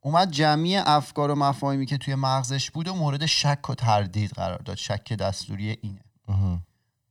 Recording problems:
none

